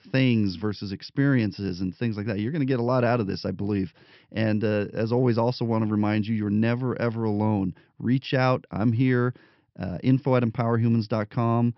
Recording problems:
high frequencies cut off; noticeable; nothing above 5.5 kHz

